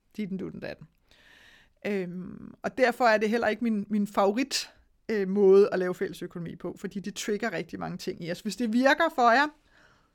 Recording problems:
none

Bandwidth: 18 kHz